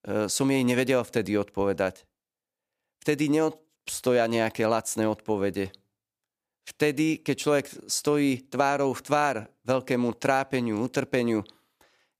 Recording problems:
none

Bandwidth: 15 kHz